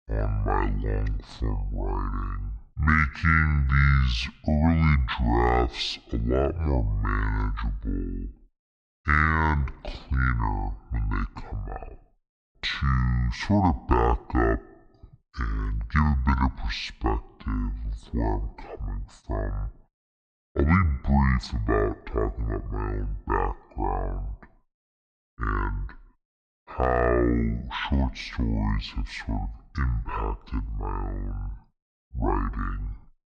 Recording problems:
wrong speed and pitch; too slow and too low; 0.5 times normal speed

